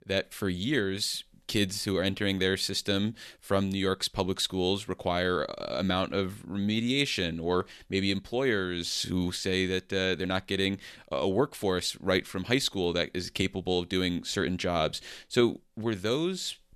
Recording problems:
none

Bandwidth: 13.5 kHz